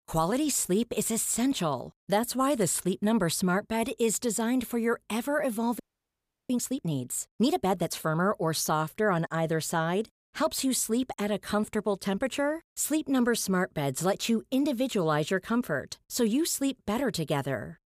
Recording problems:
audio freezing; at 6 s for 0.5 s

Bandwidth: 15 kHz